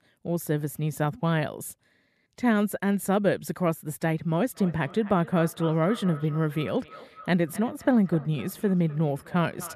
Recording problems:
echo of what is said; faint; from 4.5 s on; 260 ms later, 20 dB below the speech

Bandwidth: 14 kHz